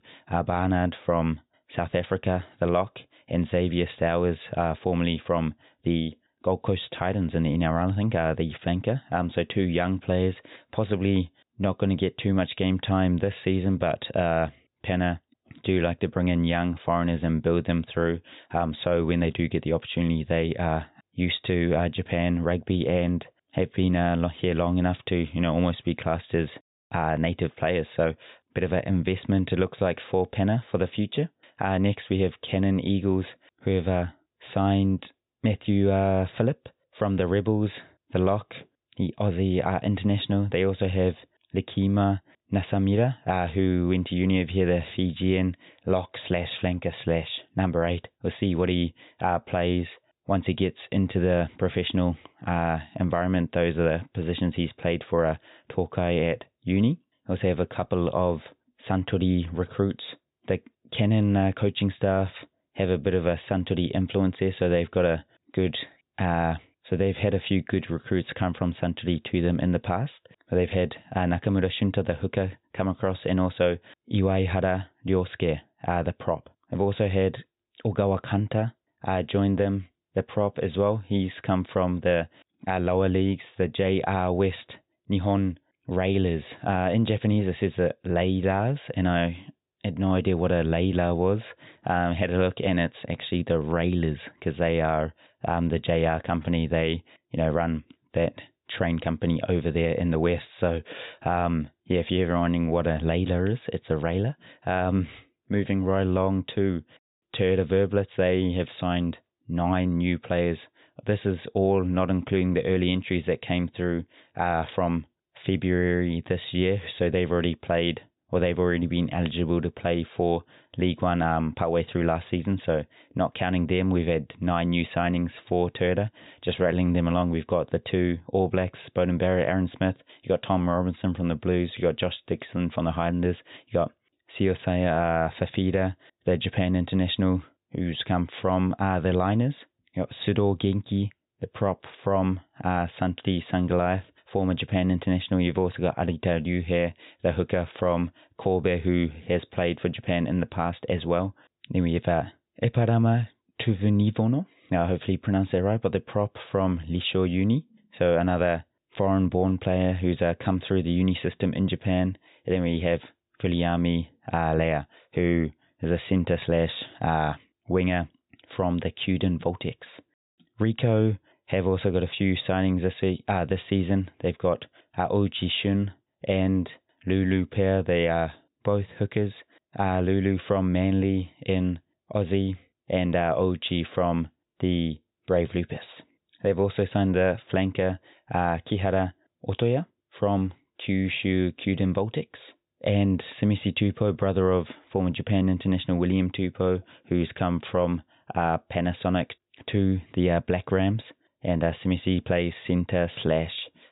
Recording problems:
high frequencies cut off; severe; nothing above 4 kHz

